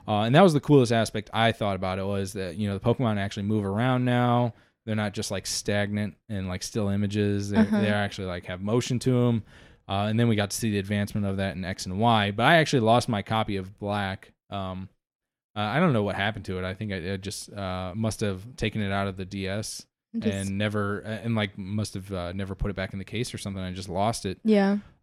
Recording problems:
none

